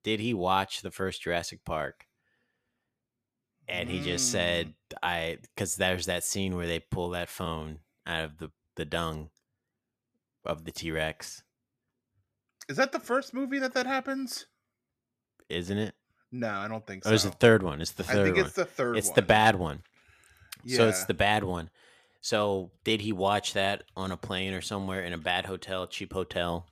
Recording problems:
none

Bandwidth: 14.5 kHz